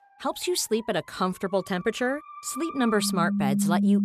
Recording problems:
background music; loud; throughout; 1 dB below the speech

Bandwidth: 14.5 kHz